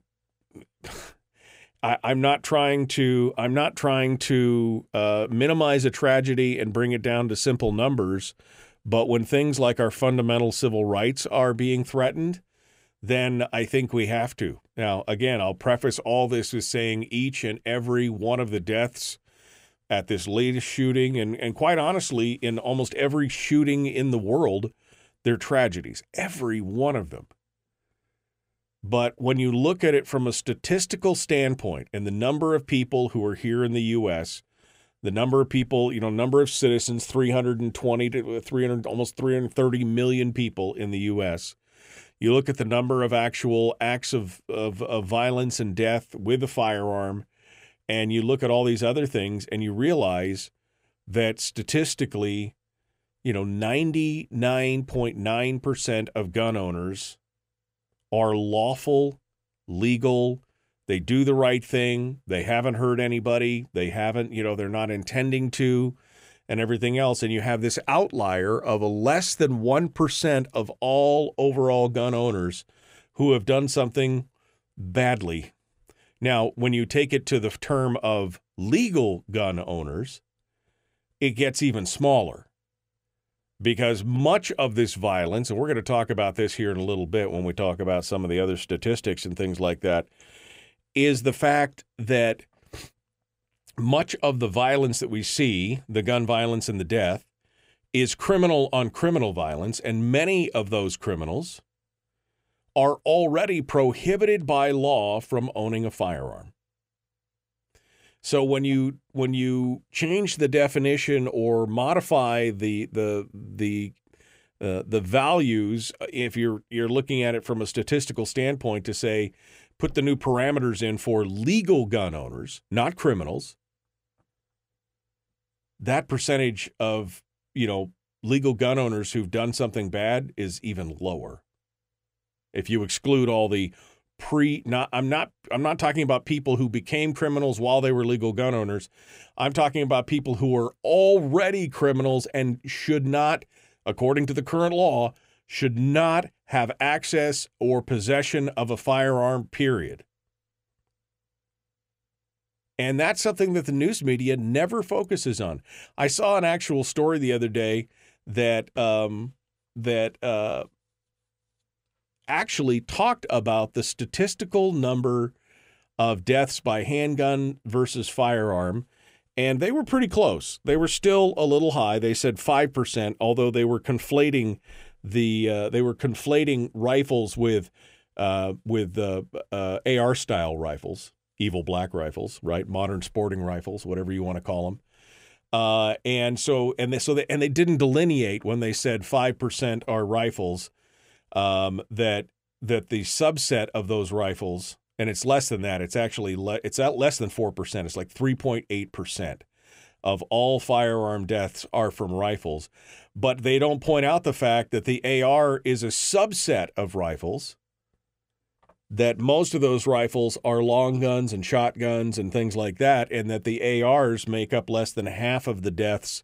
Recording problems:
none

